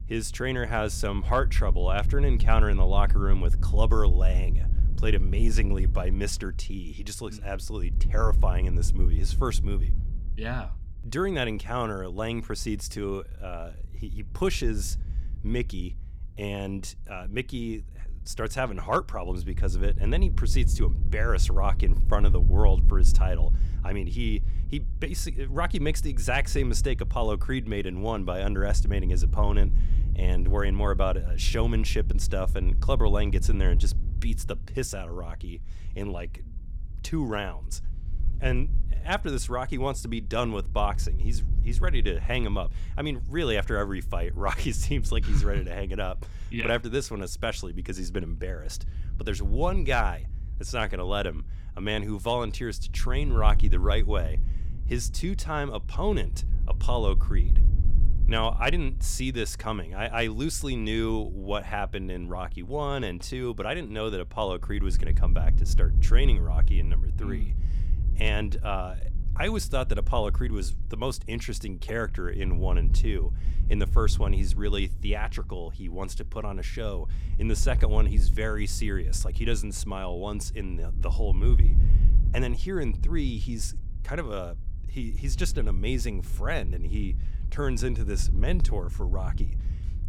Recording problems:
wind noise on the microphone; occasional gusts; 15 dB below the speech

